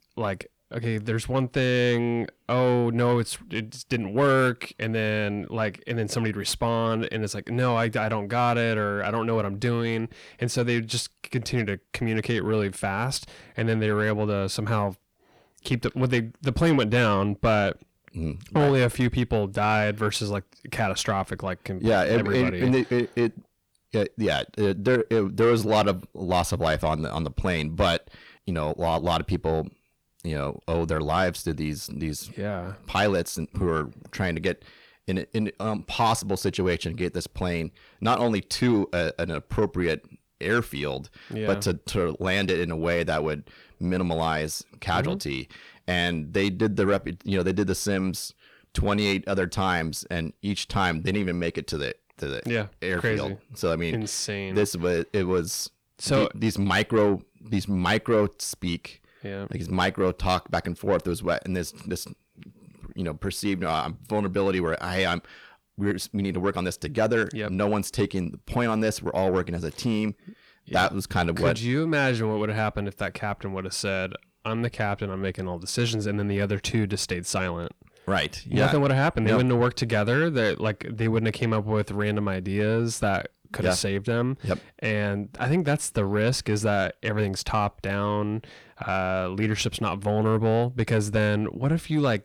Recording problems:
distortion; slight; 10 dB below the speech

